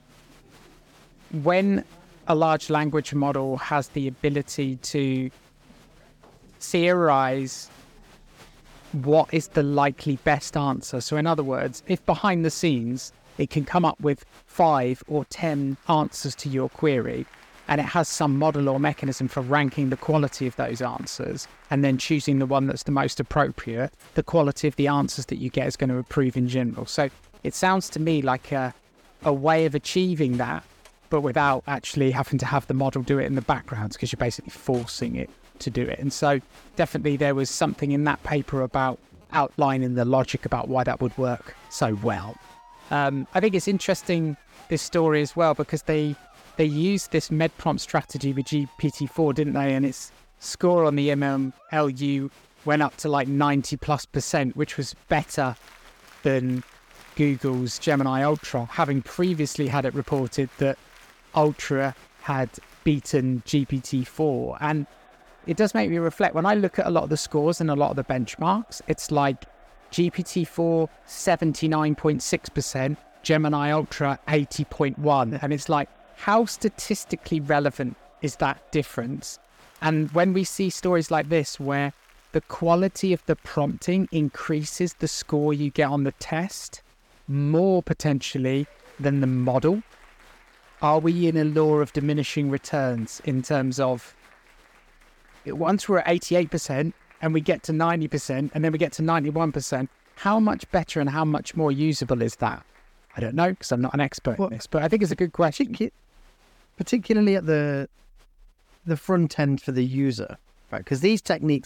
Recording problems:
crowd noise; faint; throughout; 30 dB below the speech

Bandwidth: 18 kHz